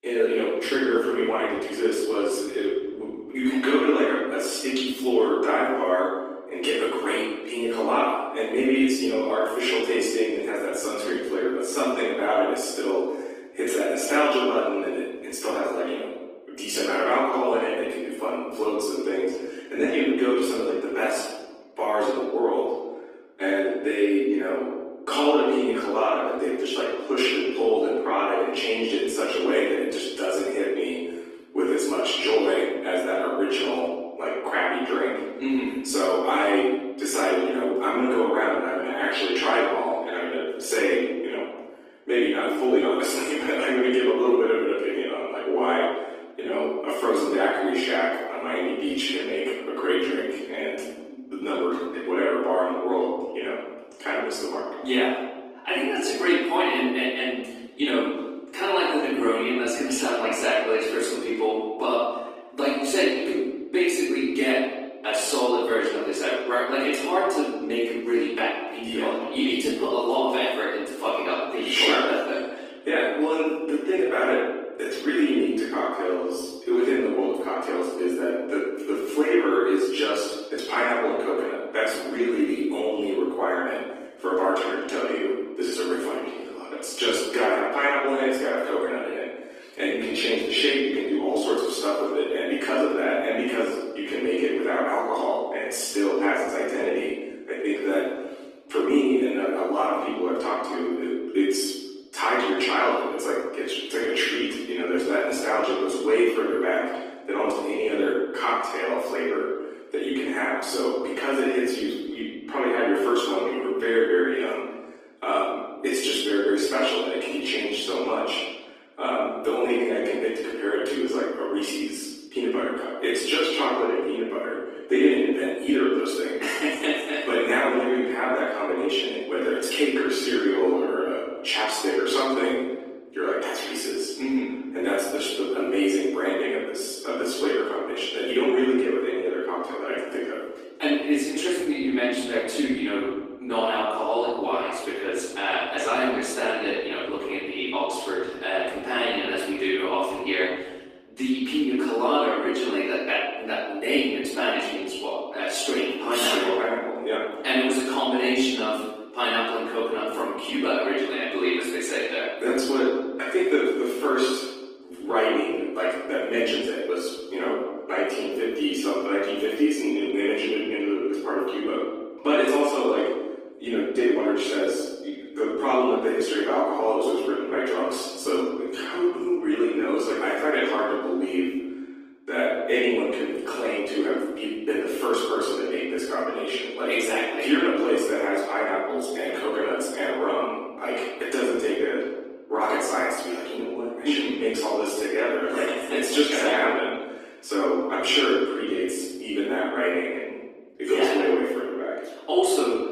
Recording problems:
room echo; strong; dies away in 1.2 s
off-mic speech; far
thin; somewhat; fading below 250 Hz
garbled, watery; slightly; nothing above 15 kHz

